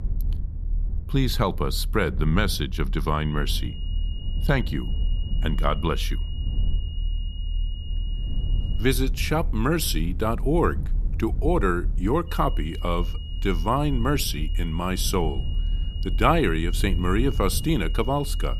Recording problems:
high-pitched whine; noticeable; from 3 to 9 s and from 12 s on; 3 kHz, 15 dB below the speech
low rumble; faint; throughout; 20 dB below the speech

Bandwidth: 14 kHz